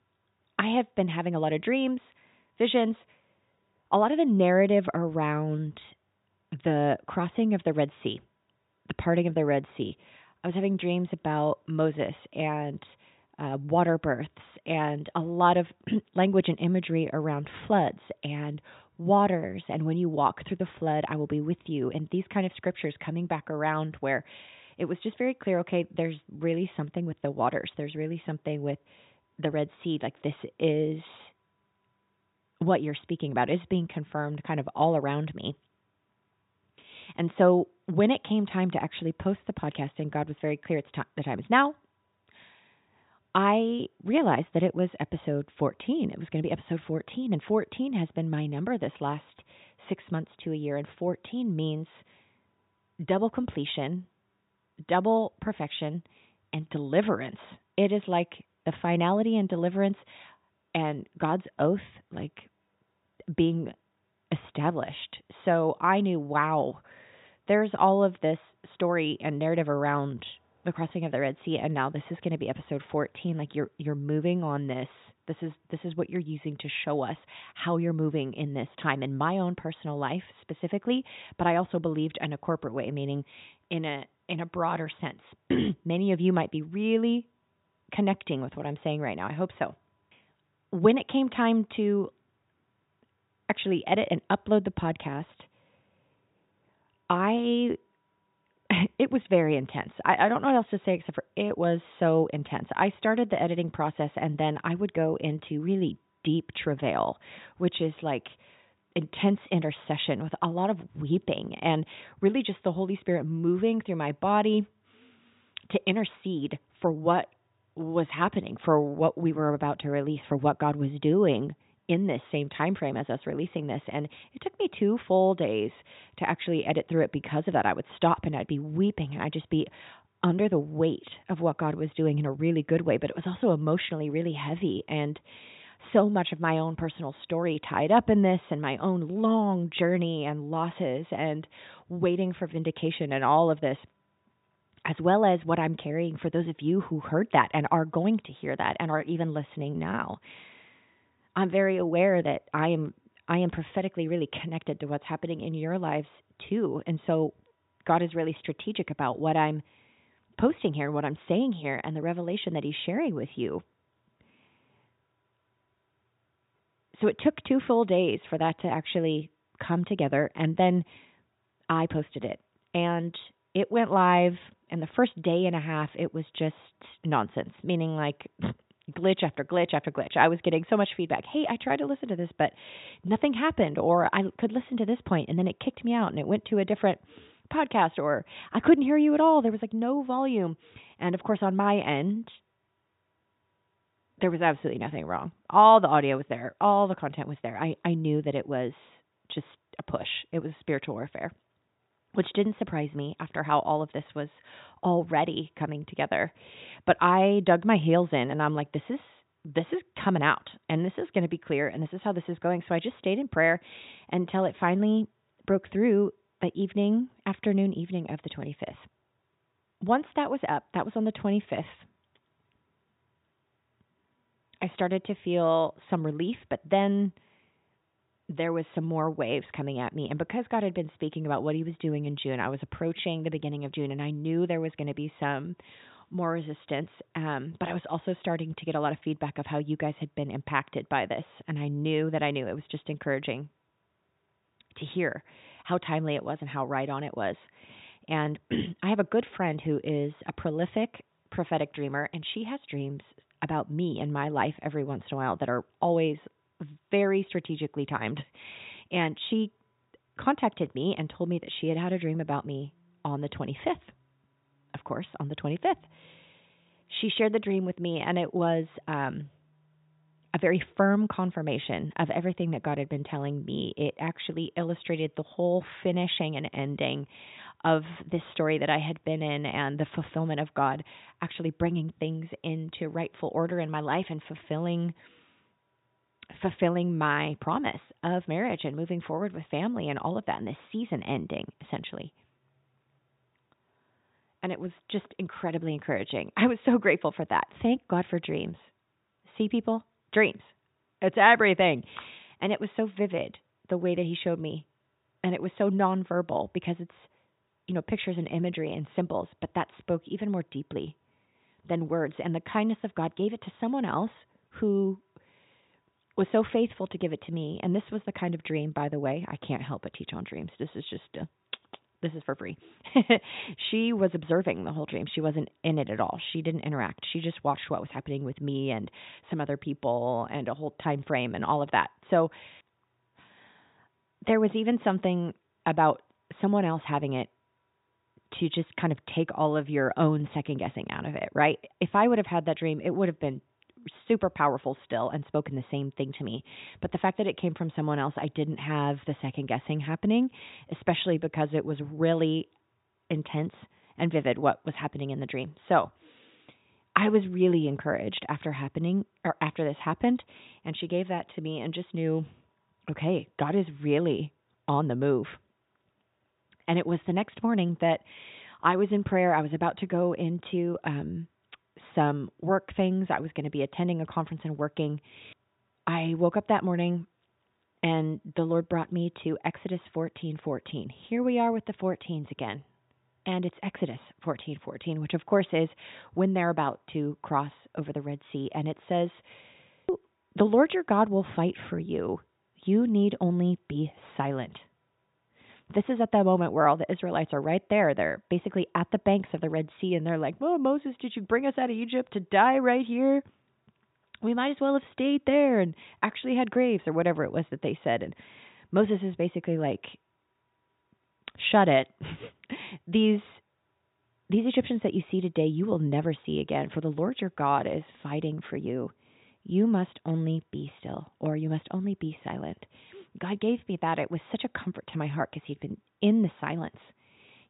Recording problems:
high frequencies cut off; severe; nothing above 4 kHz

